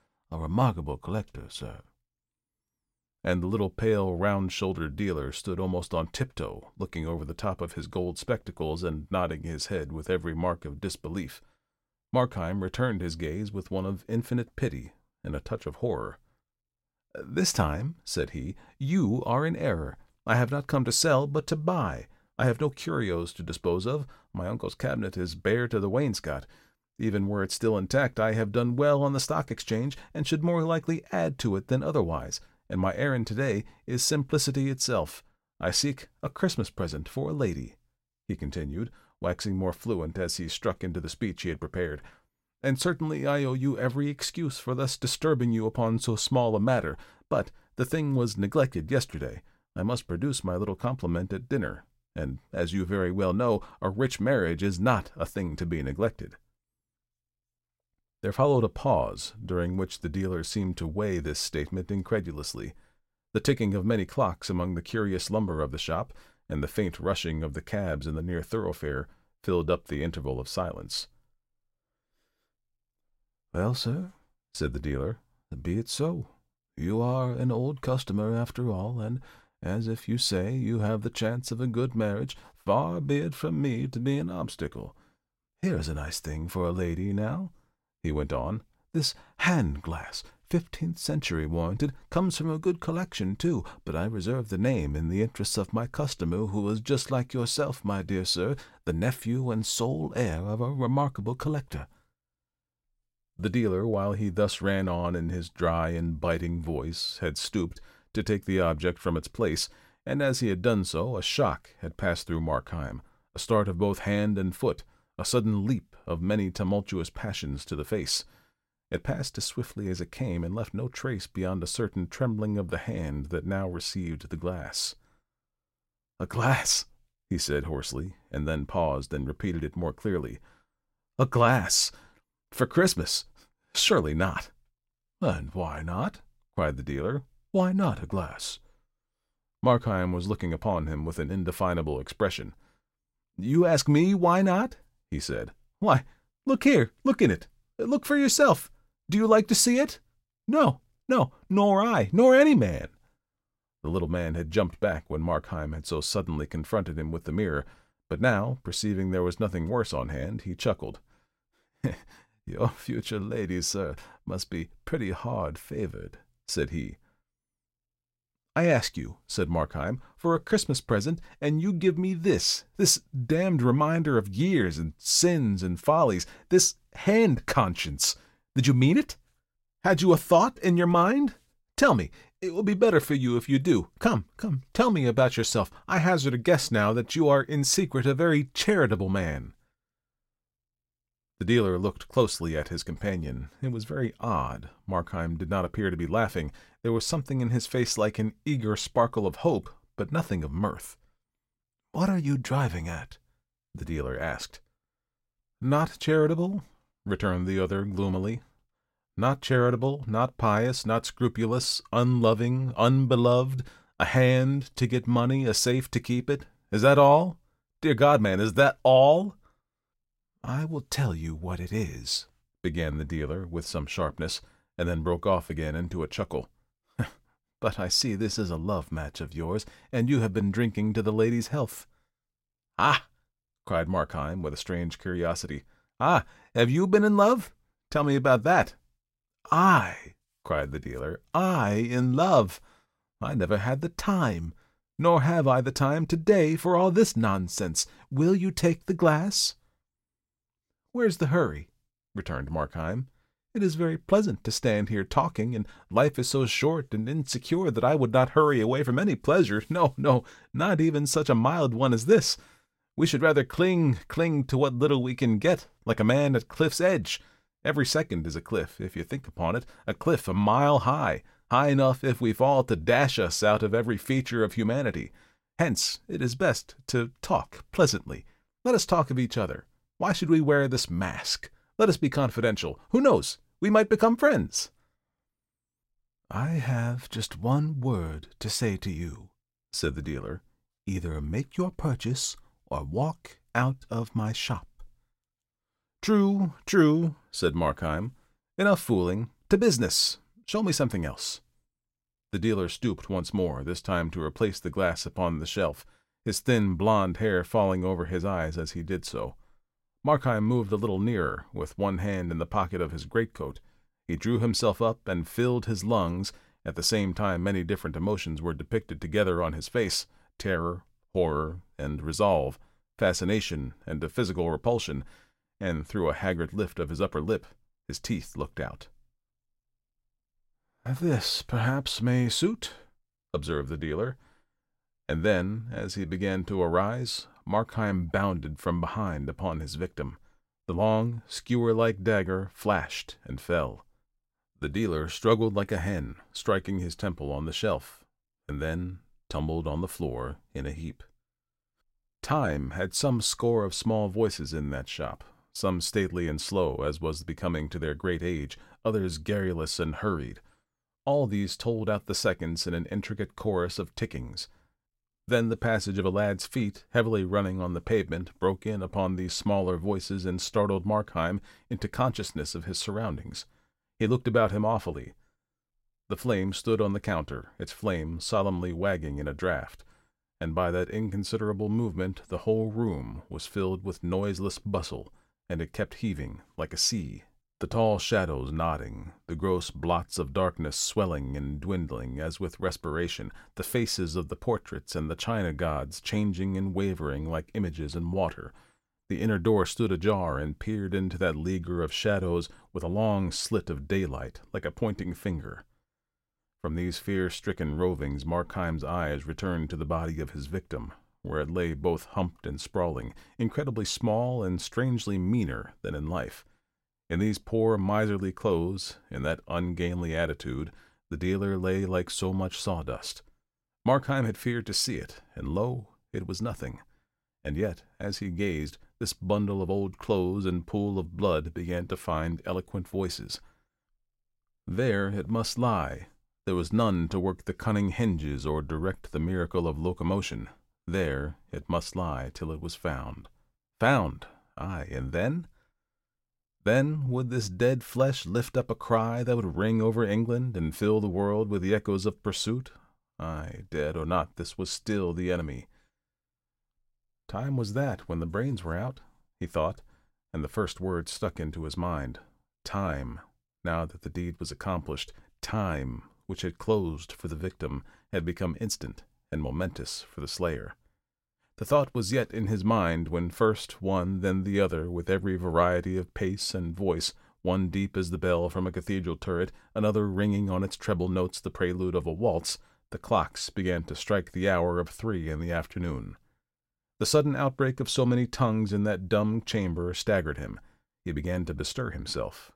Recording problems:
none

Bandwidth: 16 kHz